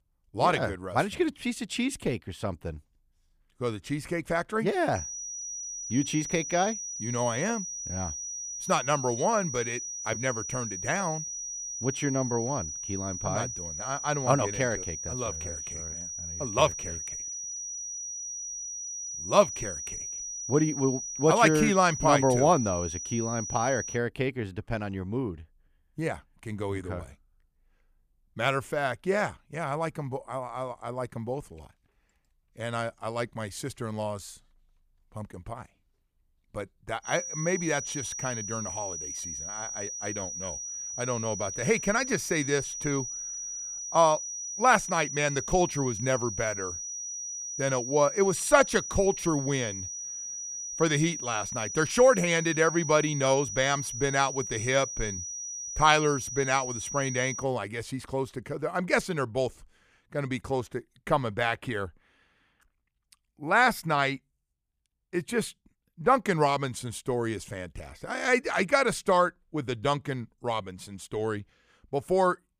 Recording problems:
high-pitched whine; loud; from 5 to 24 s and from 37 to 57 s; 6 kHz, 6 dB below the speech

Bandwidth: 15 kHz